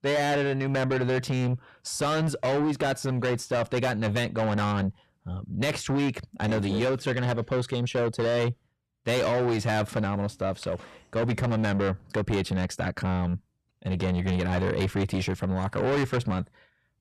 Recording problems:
distortion; heavy; 8 dB below the speech

